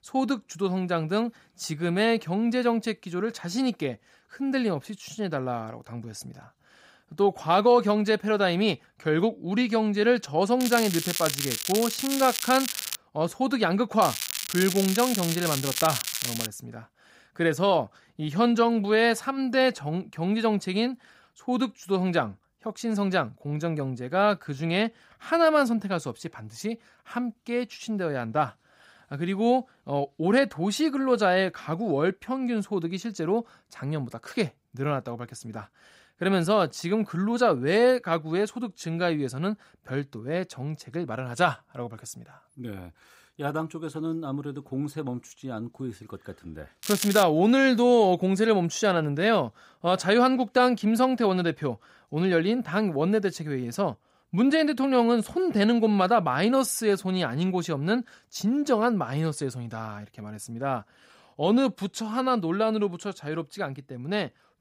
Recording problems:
crackling; loud; from 11 to 13 s, from 14 to 16 s and at 47 s; 4 dB below the speech

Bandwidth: 15.5 kHz